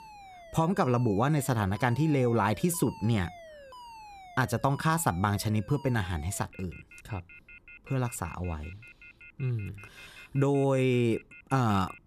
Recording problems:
alarms or sirens; faint; throughout; 20 dB below the speech

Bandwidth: 14.5 kHz